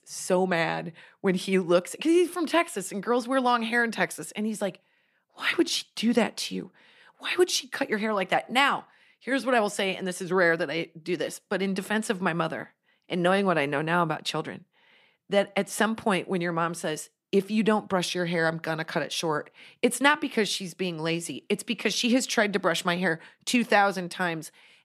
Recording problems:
none

